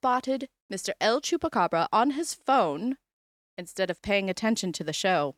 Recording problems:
none

